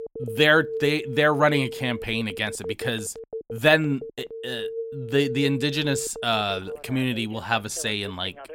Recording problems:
alarms or sirens; noticeable; throughout; 10 dB below the speech

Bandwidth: 16 kHz